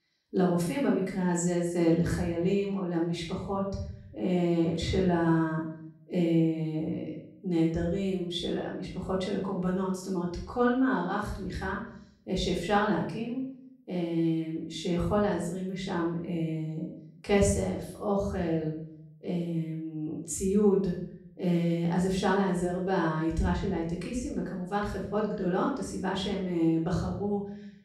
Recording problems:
off-mic speech; far
room echo; noticeable; dies away in 0.5 s

